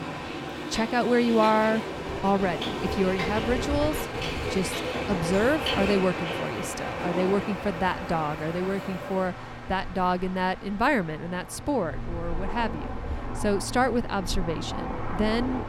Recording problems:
train or aircraft noise; loud; throughout; 5 dB below the speech

